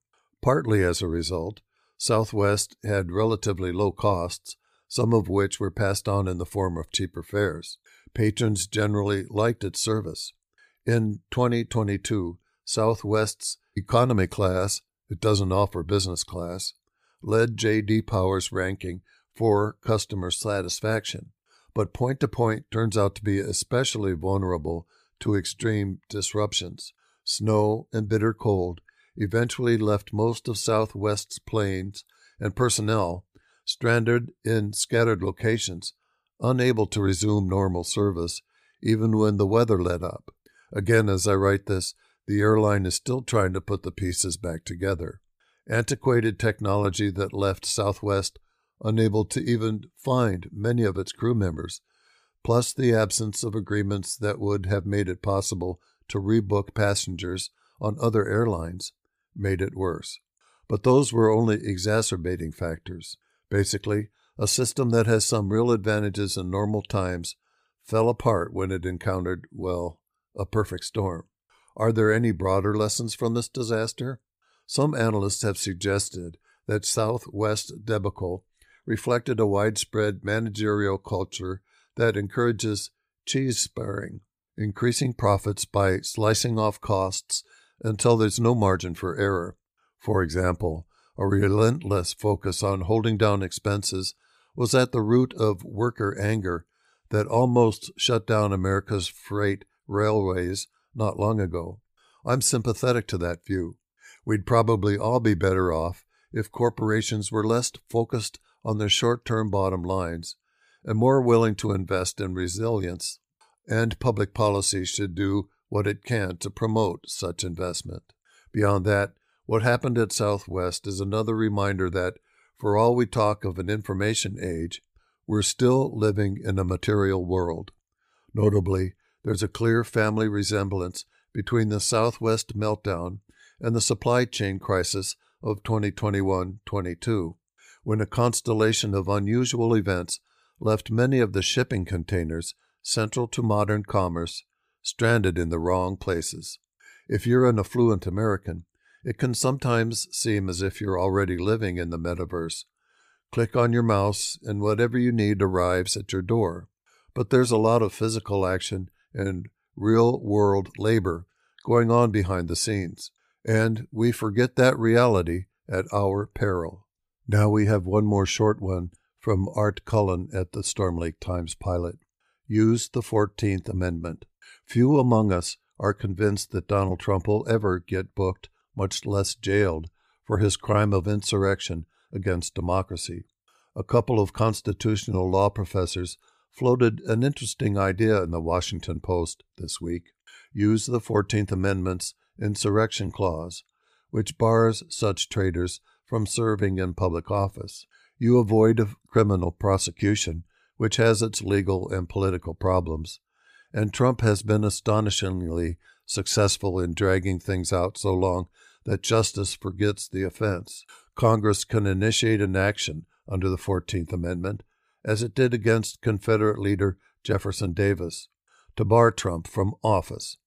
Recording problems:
none

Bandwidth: 15 kHz